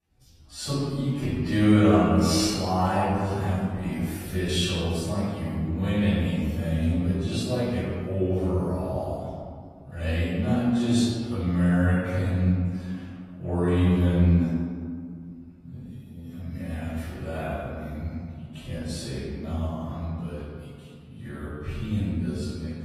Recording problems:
room echo; strong; dies away in 1.9 s
off-mic speech; far
wrong speed, natural pitch; too slow; 0.5 times normal speed
garbled, watery; slightly; nothing above 13.5 kHz

